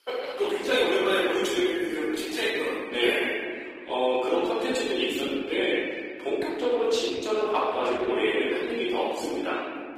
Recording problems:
room echo; strong; dies away in 2.3 s
off-mic speech; far
thin; somewhat; fading below 350 Hz
garbled, watery; slightly; nothing above 15 kHz

